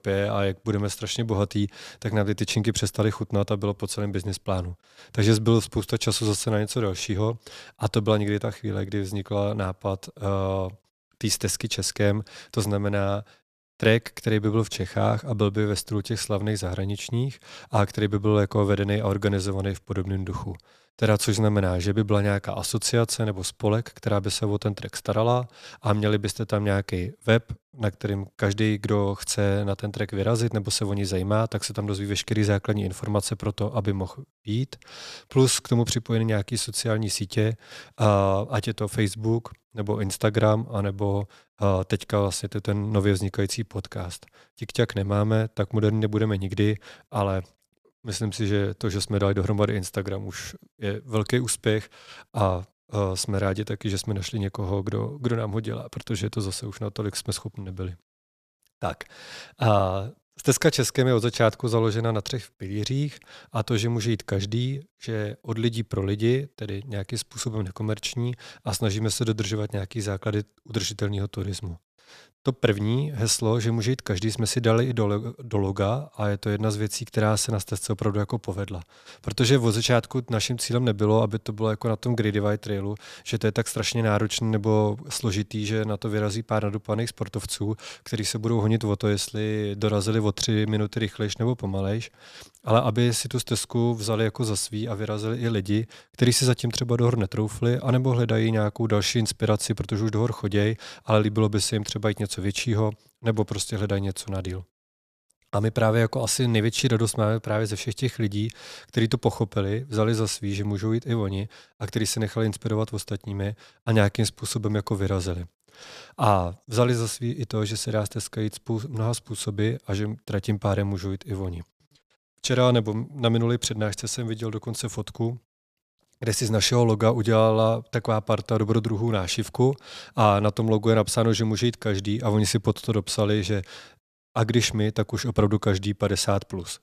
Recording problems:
none

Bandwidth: 14.5 kHz